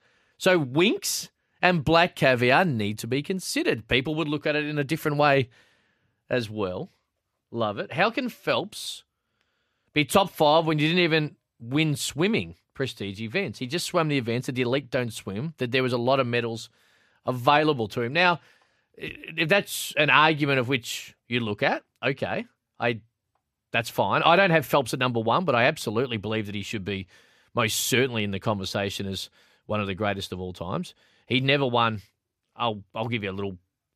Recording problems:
none

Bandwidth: 14.5 kHz